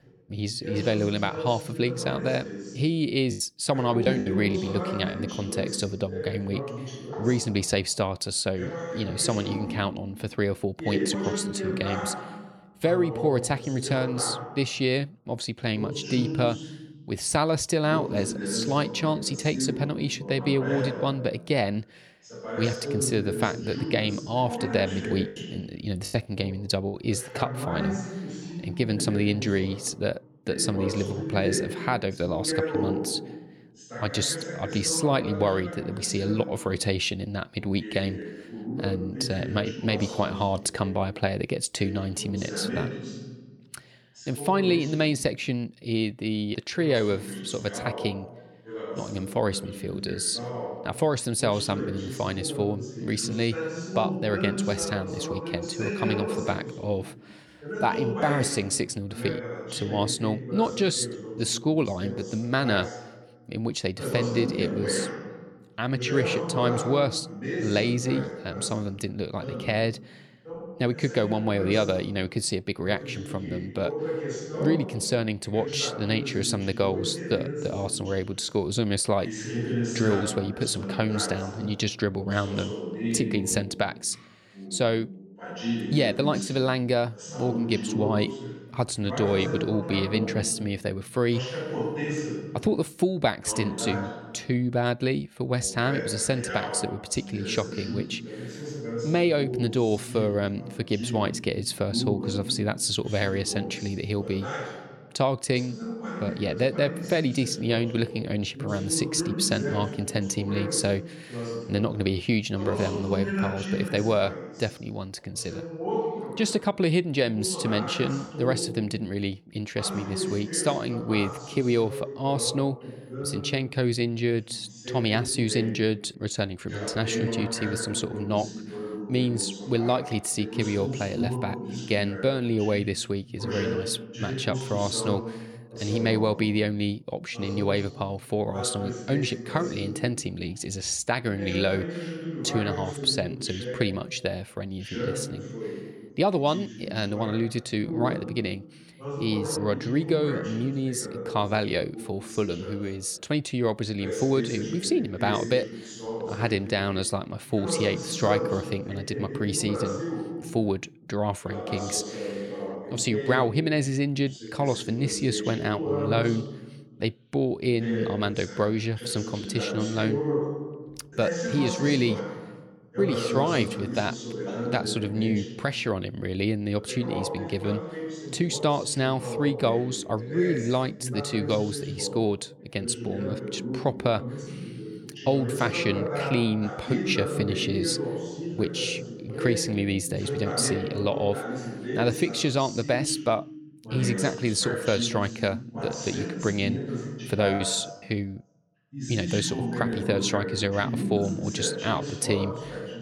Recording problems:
voice in the background; loud; throughout; 6 dB below the speech
choppy; very; from 3.5 to 5 s, at 26 s and at 3:18; 9% of the speech affected

